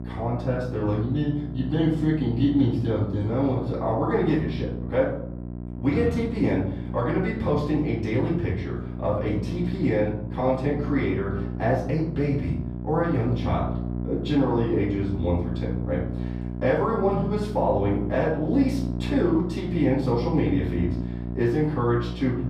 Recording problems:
off-mic speech; far
room echo; noticeable; dies away in 0.6 s
muffled; slightly; fading above 3.5 kHz
electrical hum; noticeable; throughout; 60 Hz, 10 dB below the speech

